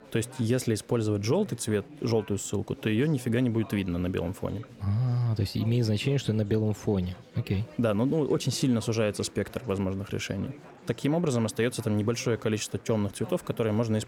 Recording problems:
chatter from many people; faint; throughout; 20 dB below the speech

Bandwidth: 17 kHz